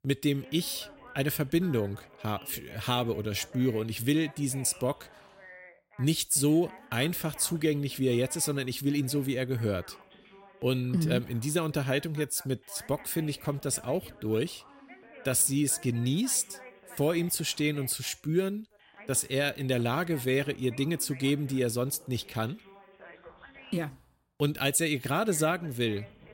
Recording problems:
background chatter; faint; throughout; 2 voices, 20 dB below the speech

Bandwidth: 16 kHz